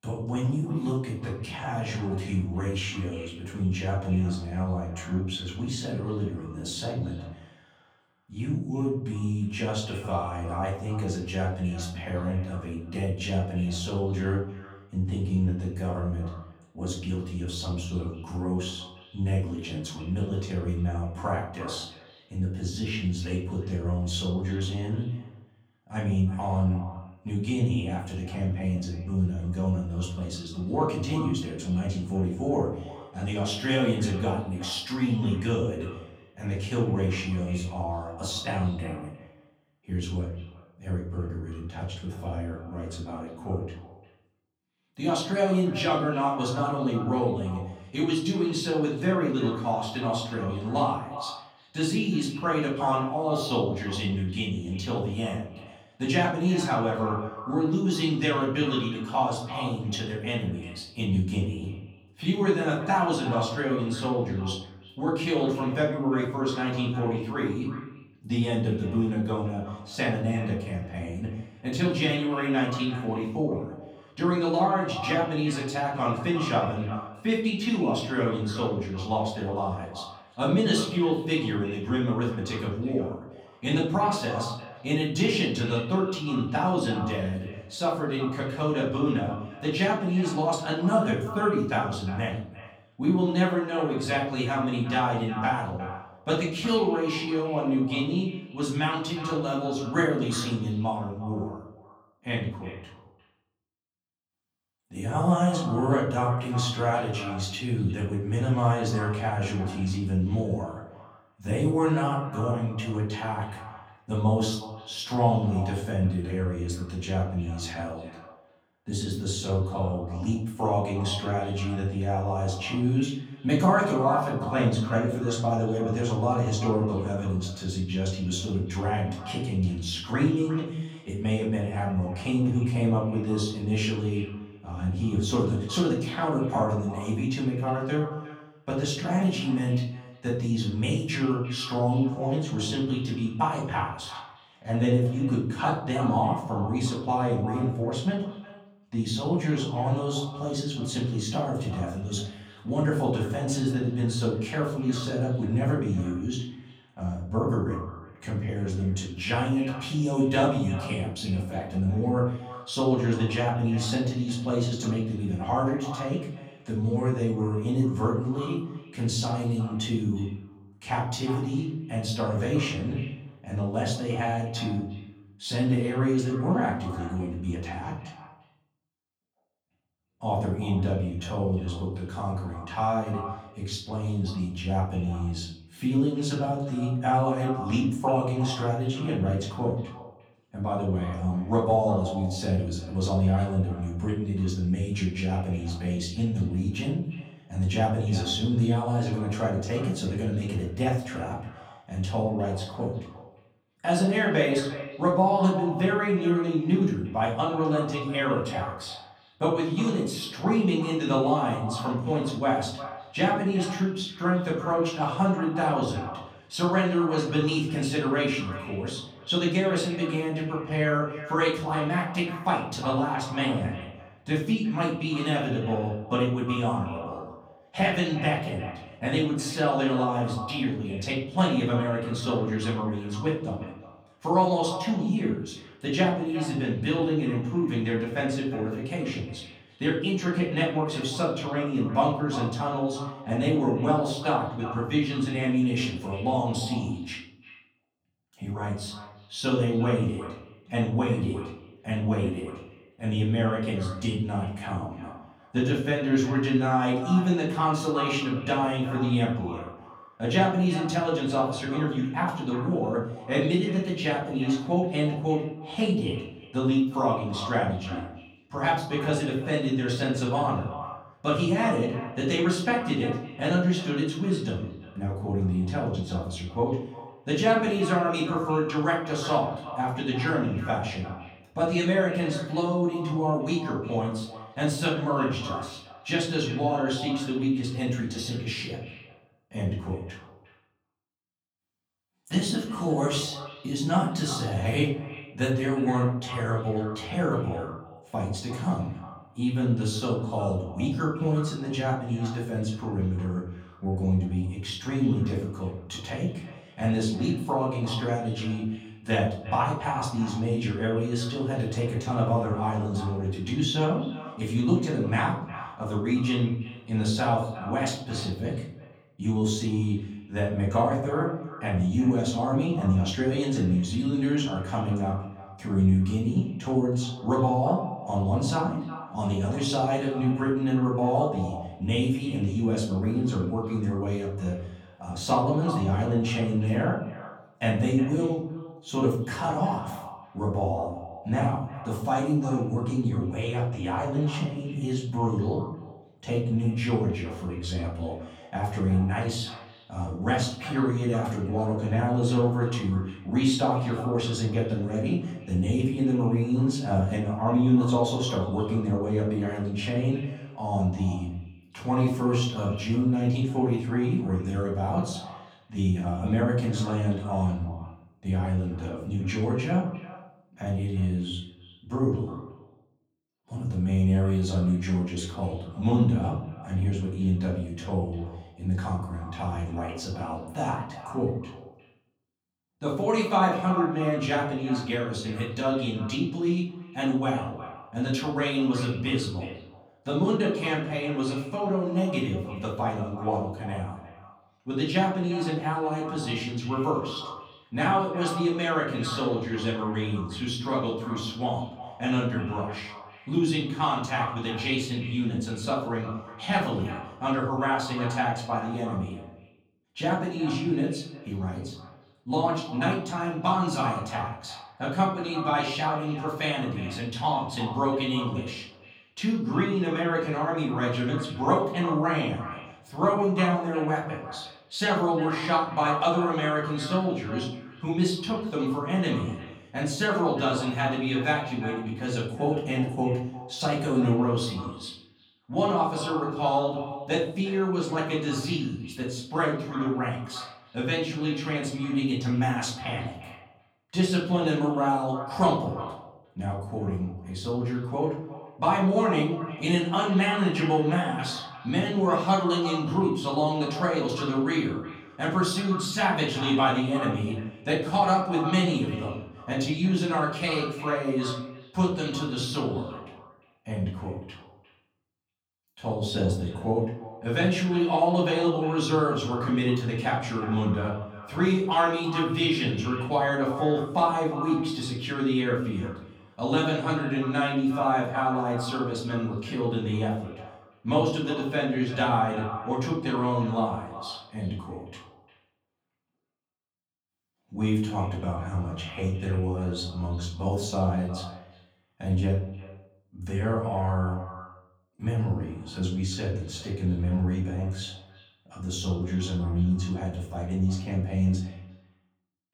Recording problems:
off-mic speech; far
echo of what is said; noticeable; throughout; 360 ms later, 15 dB below the speech
room echo; noticeable; dies away in 0.6 s

